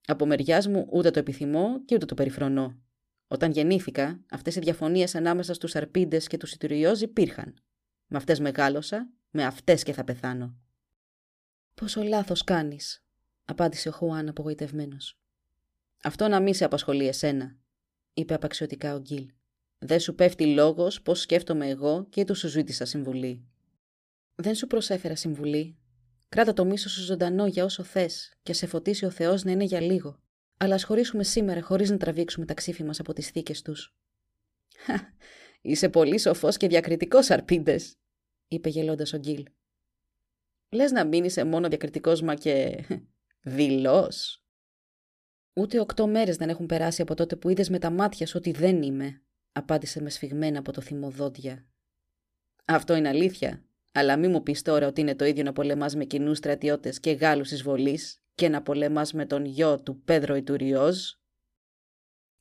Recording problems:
none

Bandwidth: 15 kHz